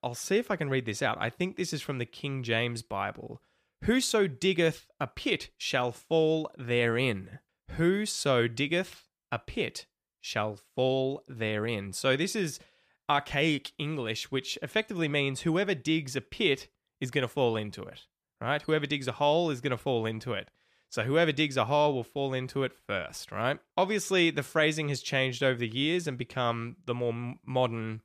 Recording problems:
none

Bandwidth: 15 kHz